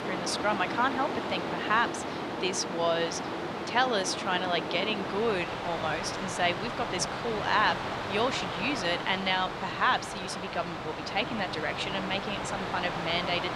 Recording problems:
thin; very slightly; fading below 1 kHz
train or aircraft noise; loud; throughout; 4 dB below the speech

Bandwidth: 15 kHz